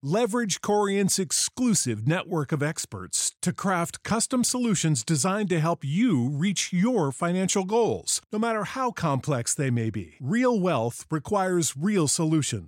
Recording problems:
none

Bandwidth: 16 kHz